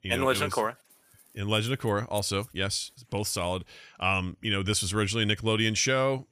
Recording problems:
none

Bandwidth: 15 kHz